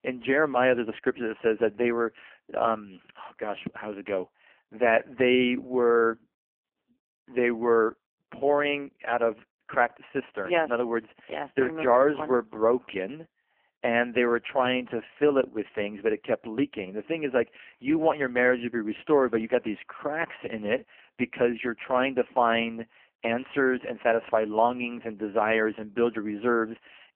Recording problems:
phone-call audio; poor line; nothing above 3 kHz

